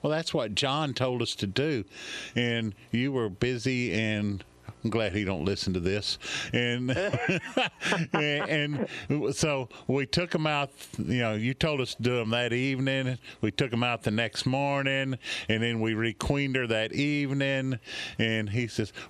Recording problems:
squashed, flat; heavily

